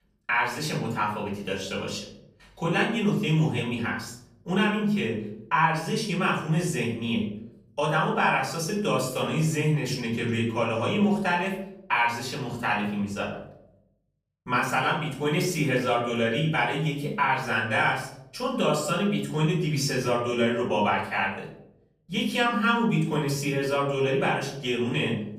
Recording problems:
off-mic speech; far
room echo; noticeable; dies away in 0.7 s

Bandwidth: 15 kHz